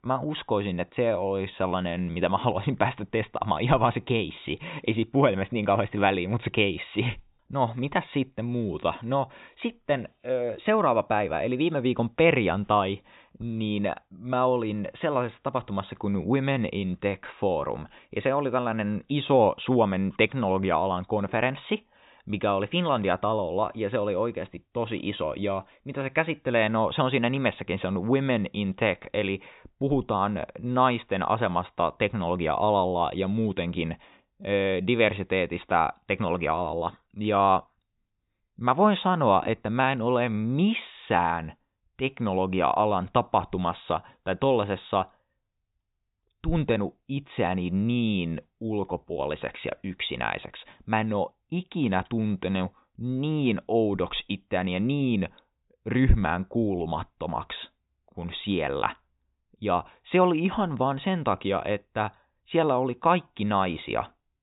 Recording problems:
high frequencies cut off; severe; nothing above 4 kHz

